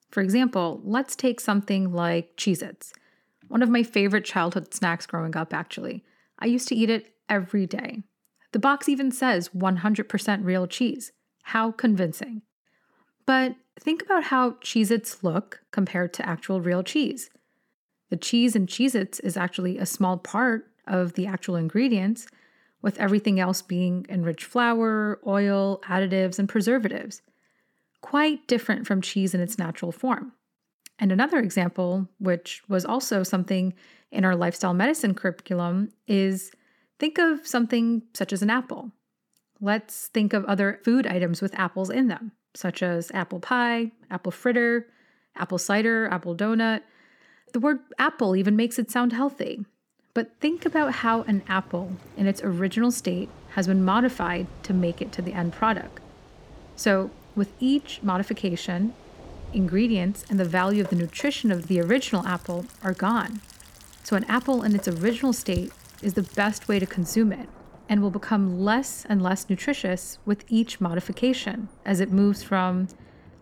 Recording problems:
rain or running water; faint; from 51 s on; 20 dB below the speech

